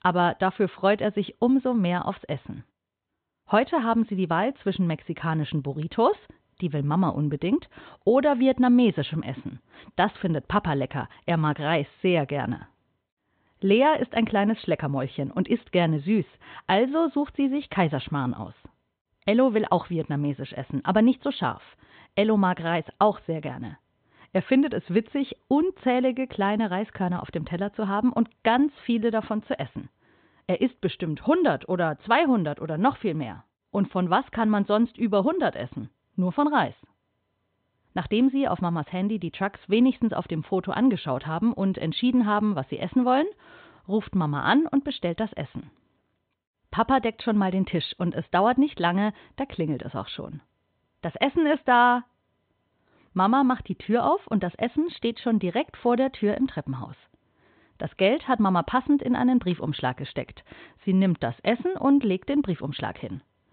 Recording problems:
high frequencies cut off; severe; nothing above 4 kHz

